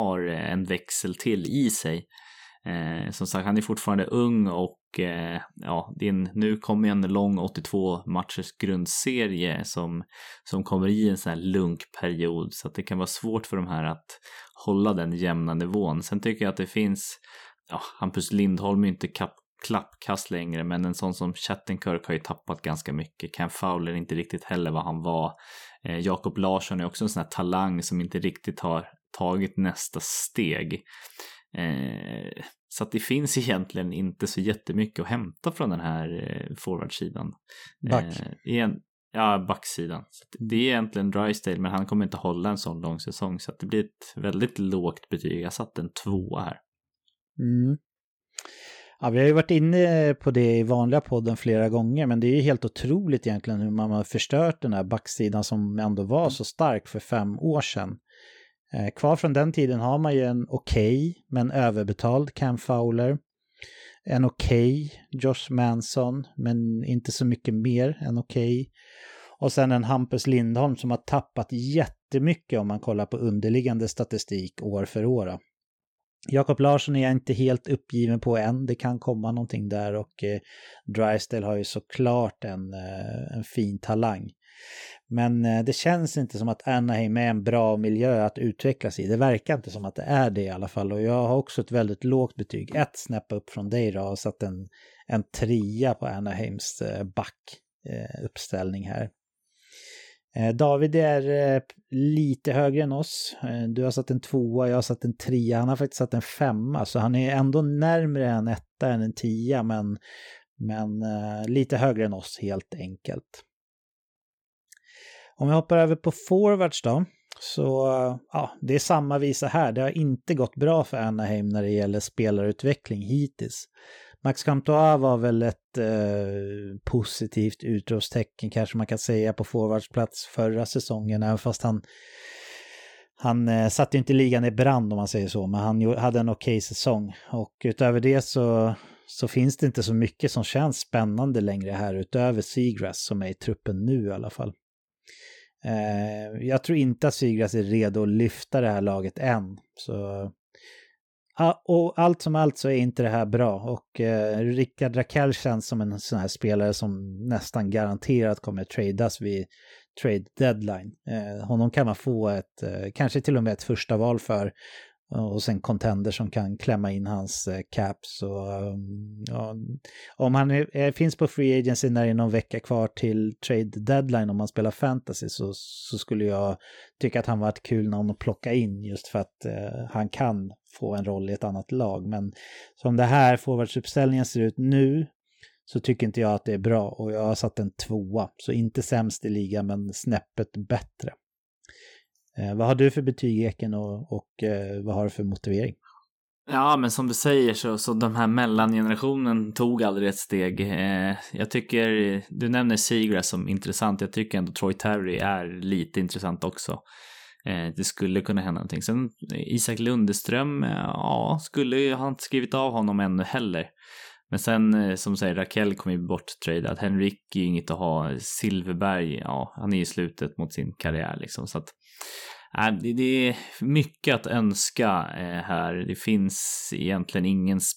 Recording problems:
abrupt cut into speech; at the start

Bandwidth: 18 kHz